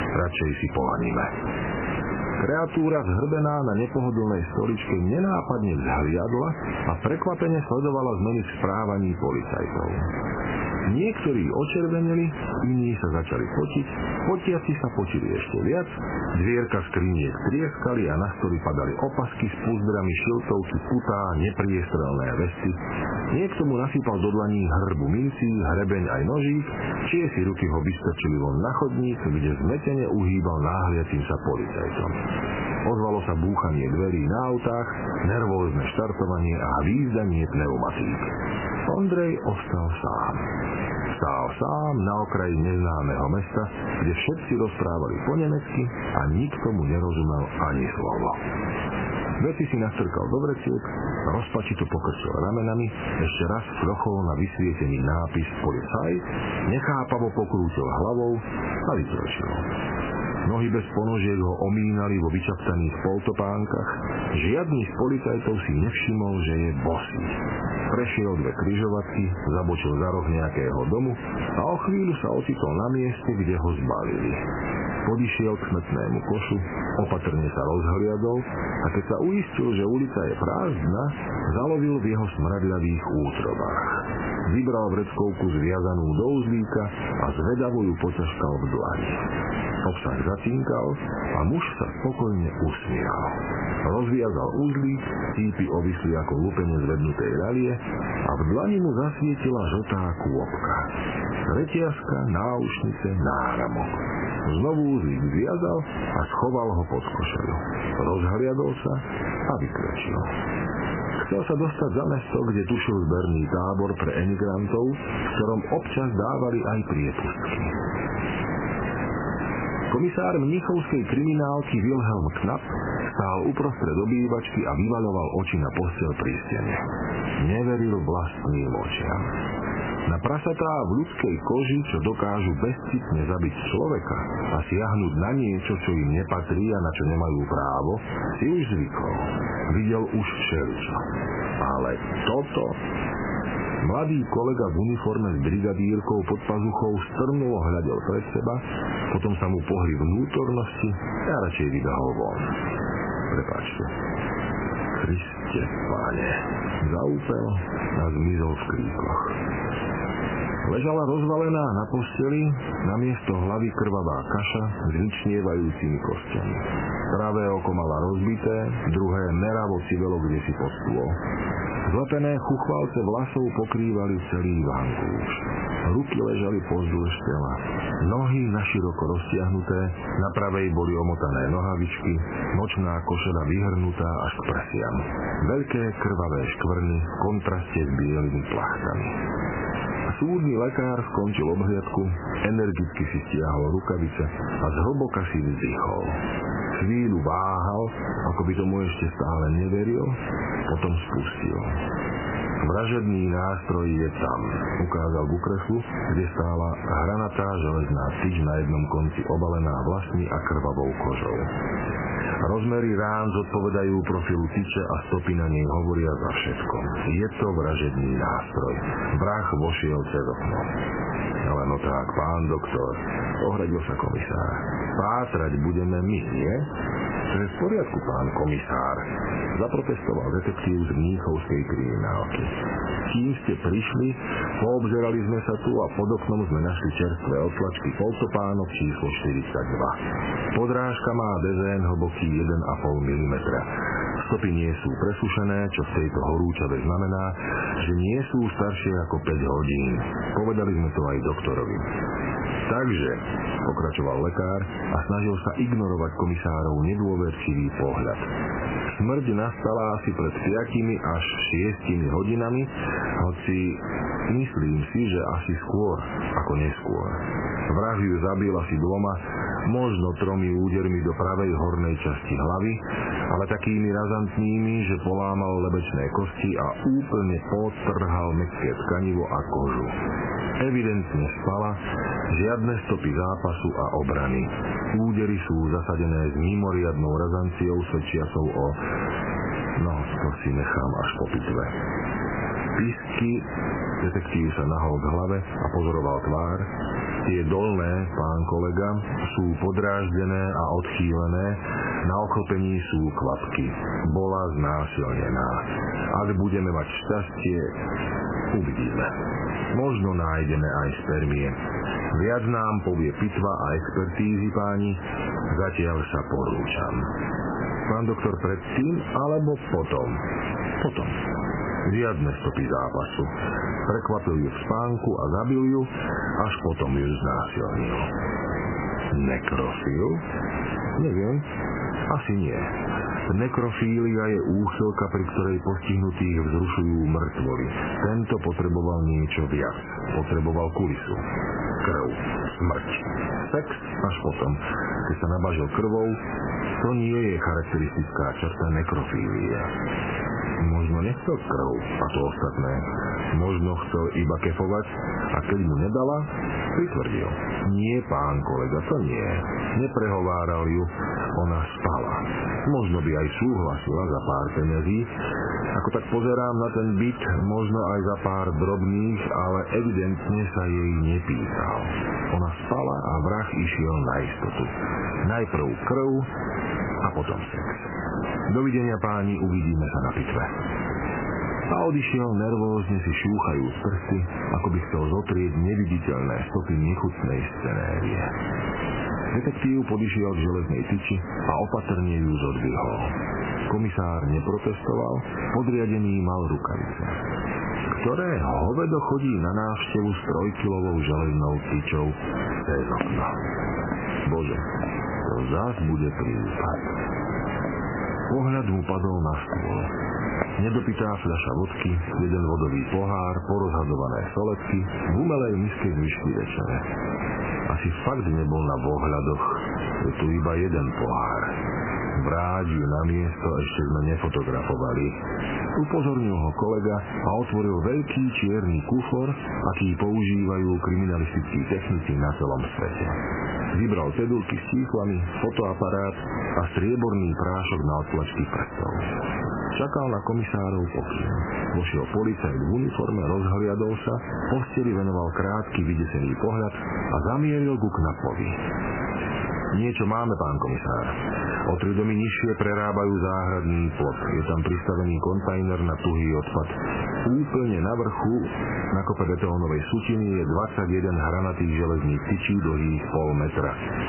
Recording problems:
garbled, watery; badly; nothing above 3 kHz
squashed, flat; heavily
echo of what is said; faint; from 5:41 on; 460 ms later, 20 dB below the speech
hiss; loud; throughout; 8 dB below the speech
footsteps; noticeable; from 6:43 to 6:51; peak 6 dB below the speech

